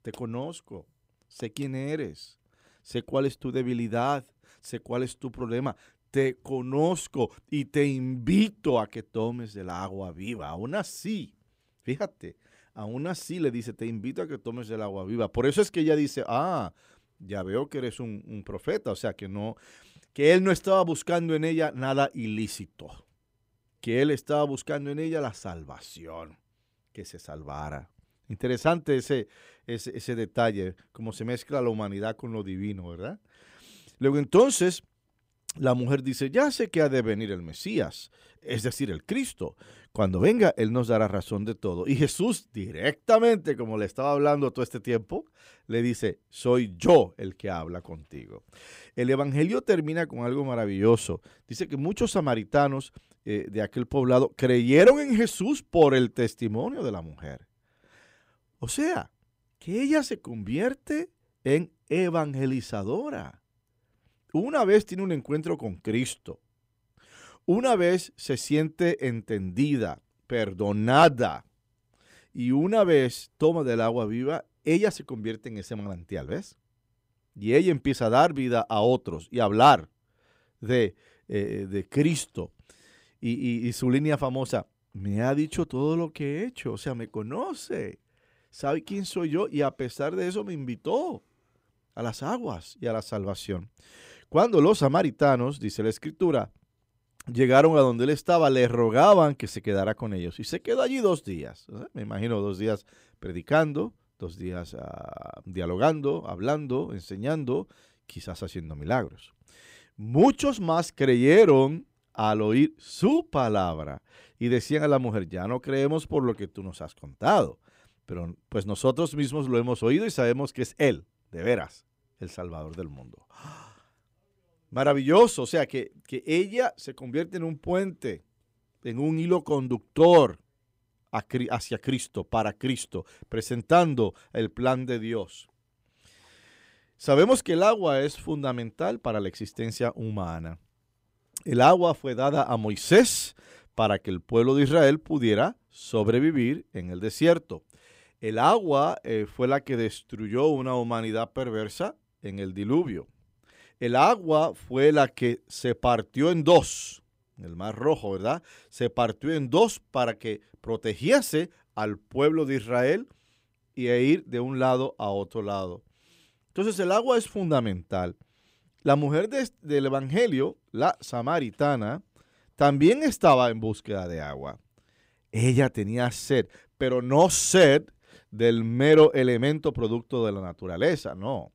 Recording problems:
none

